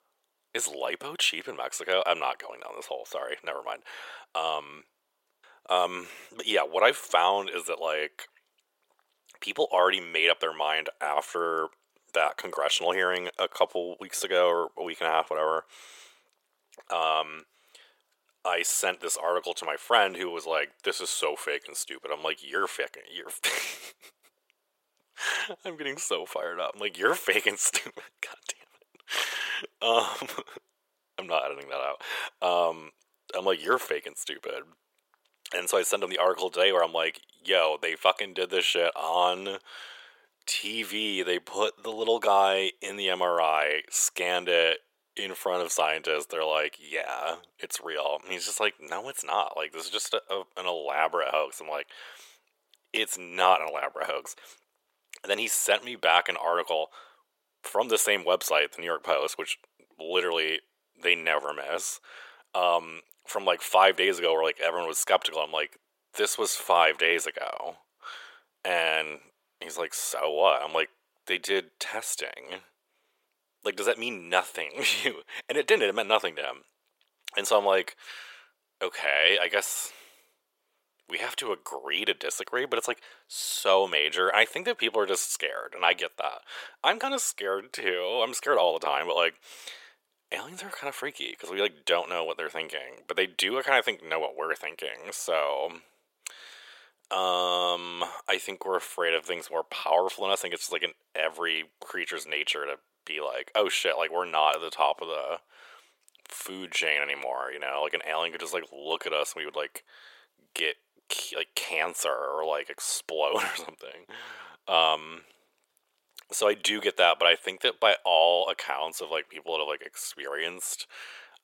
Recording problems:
thin; very; fading below 450 Hz

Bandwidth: 16.5 kHz